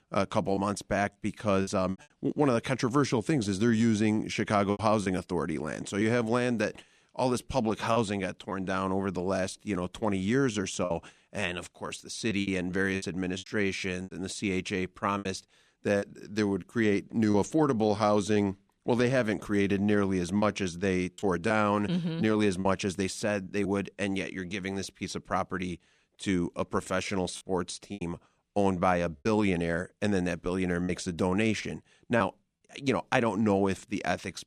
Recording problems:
choppy; occasionally; 4% of the speech affected

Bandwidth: 14 kHz